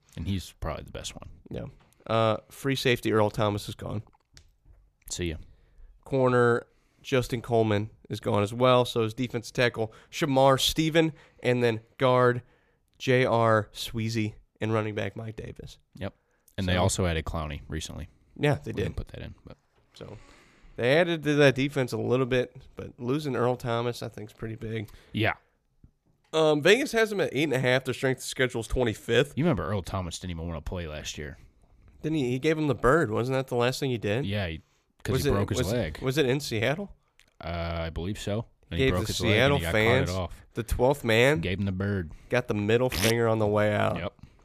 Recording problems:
none

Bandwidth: 14.5 kHz